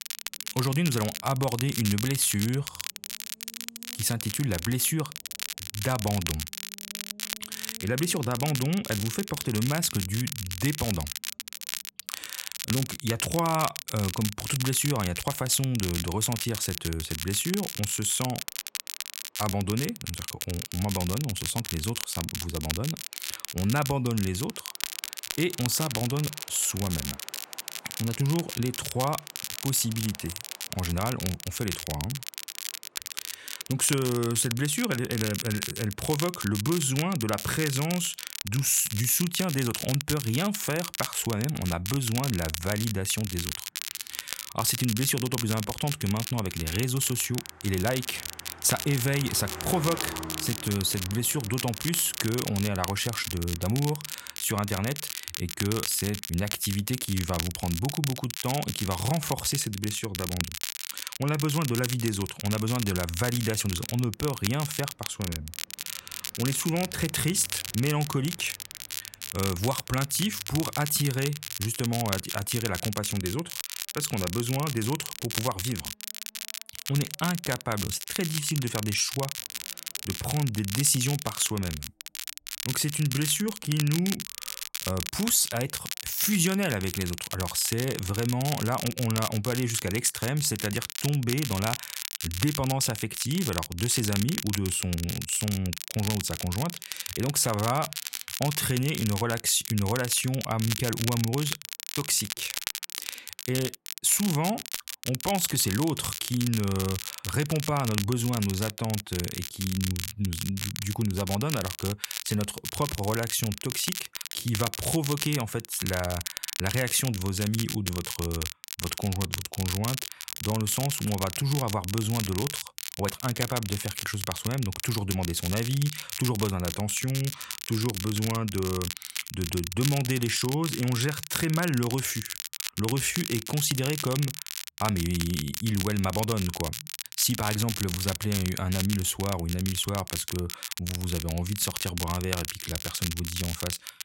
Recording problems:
crackle, like an old record; loud; 6 dB below the speech
traffic noise; faint; throughout; 20 dB below the speech

